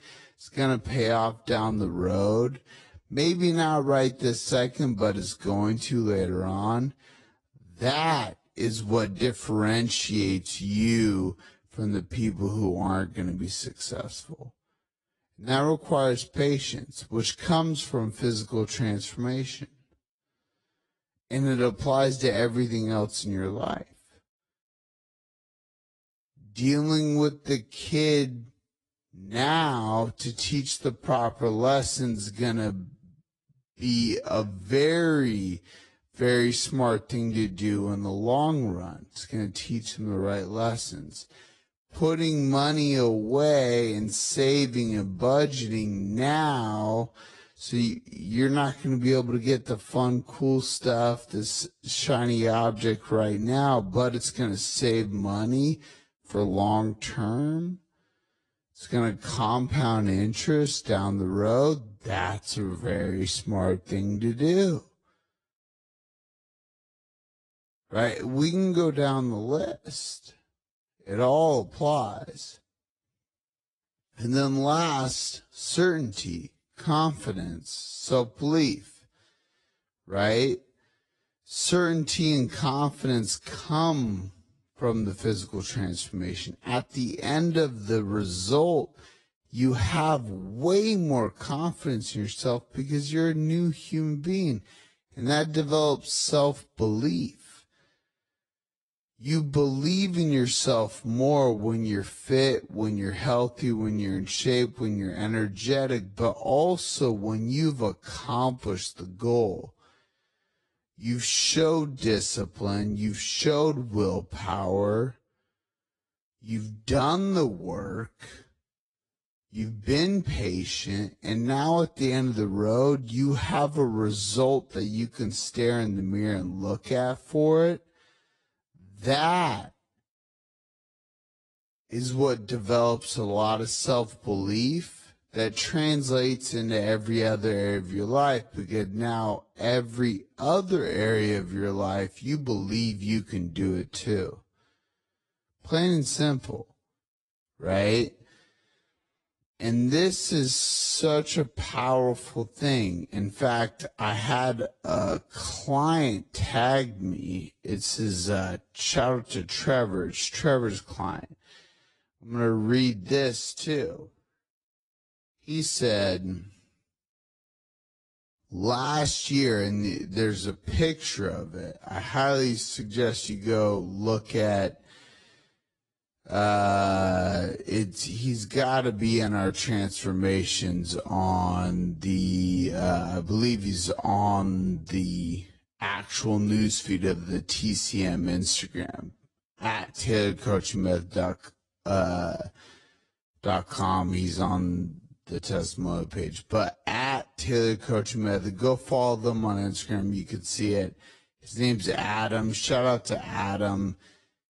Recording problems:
wrong speed, natural pitch; too slow; 0.5 times normal speed
garbled, watery; slightly

